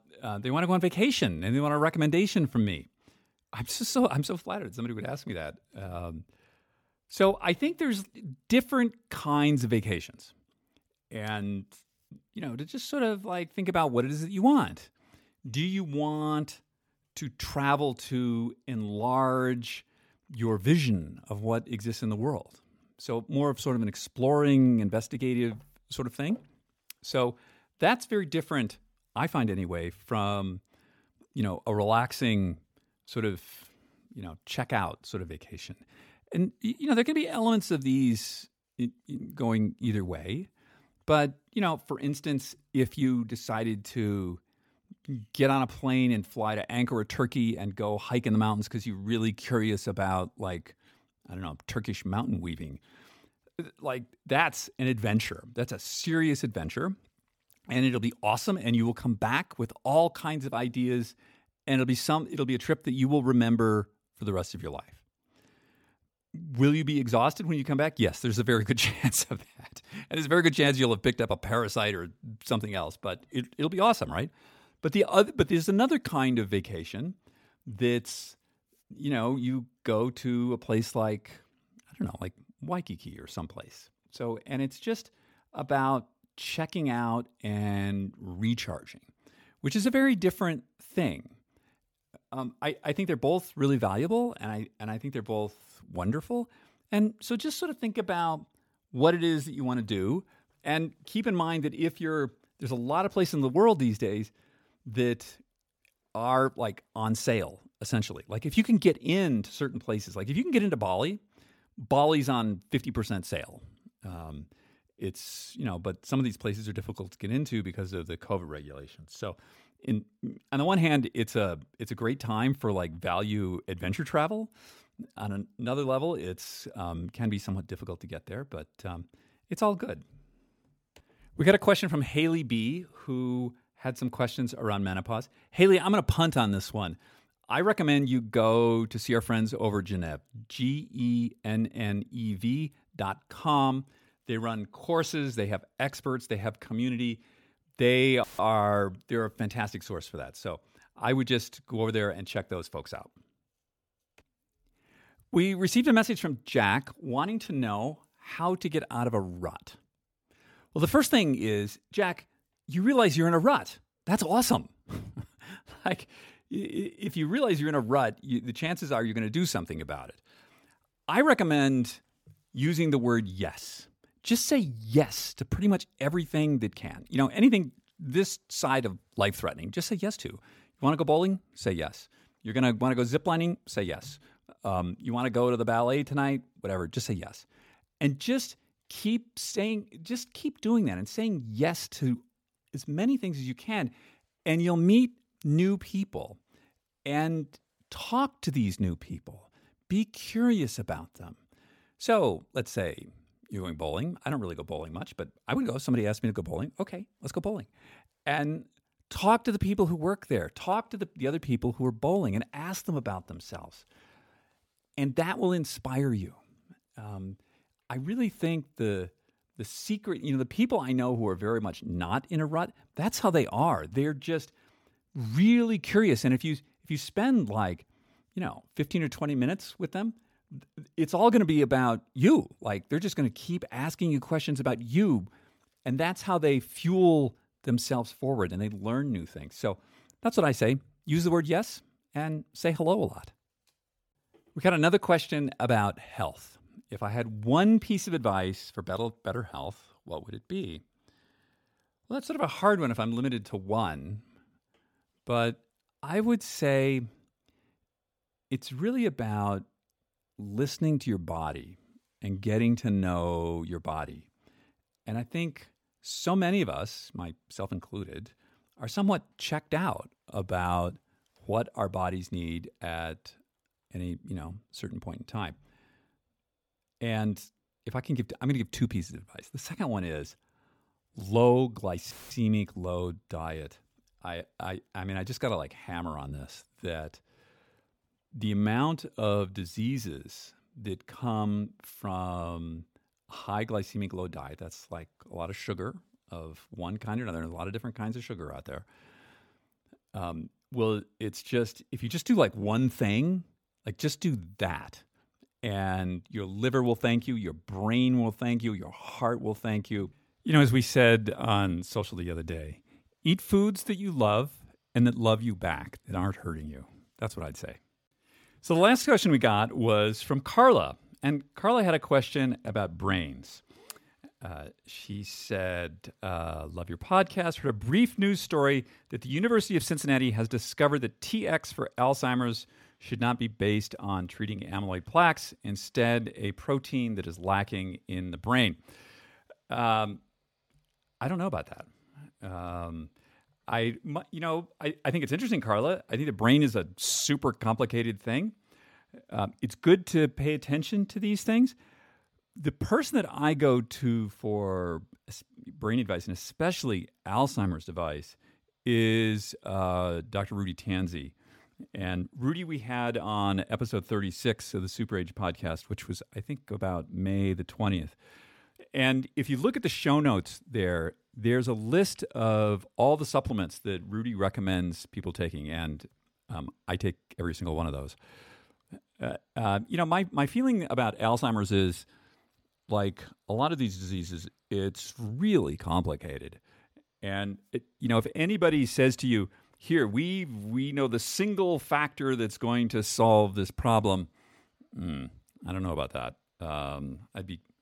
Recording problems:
audio cutting out; filled with static; at 2:28 and at 4:42

